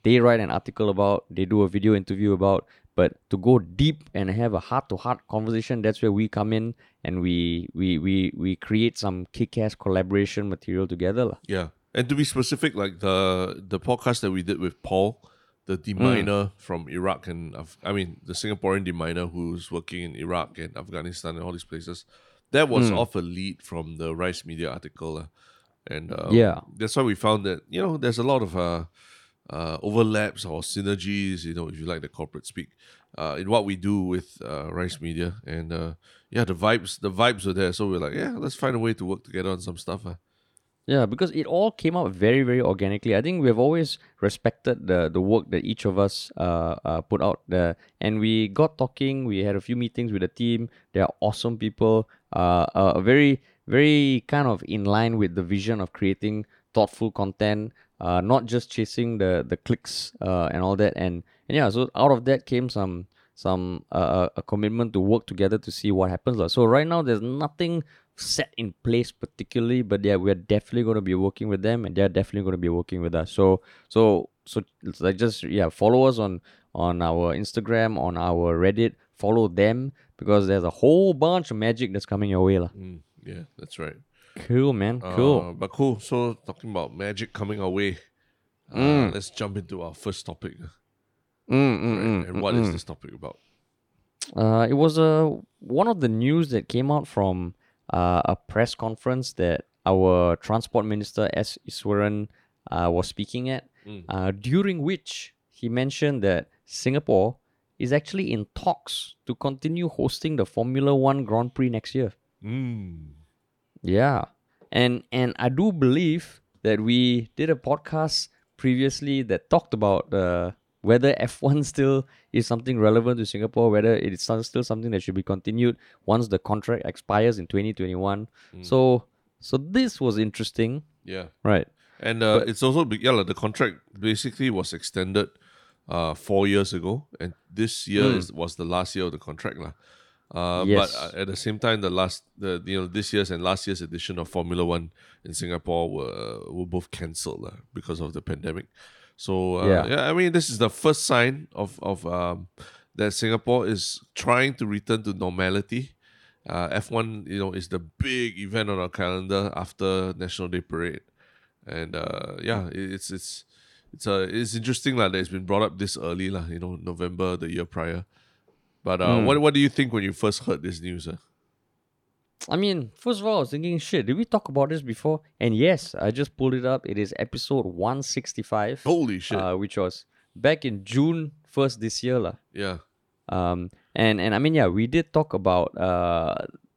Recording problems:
none

